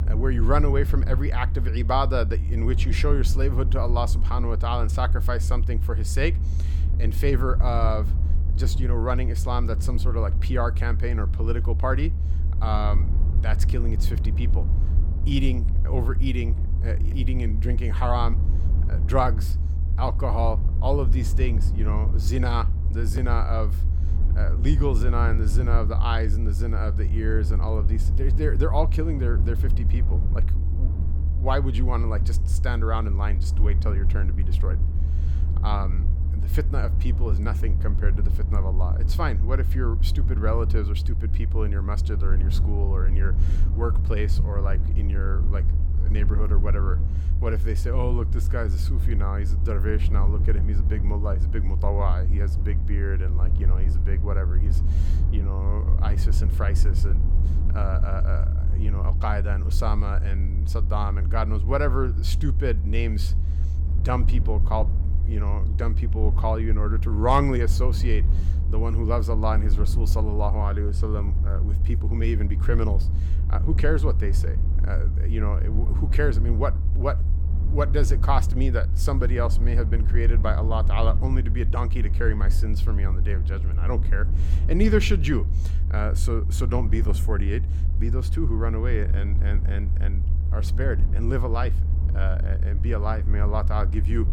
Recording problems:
low rumble; noticeable; throughout; 10 dB below the speech

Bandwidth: 17.5 kHz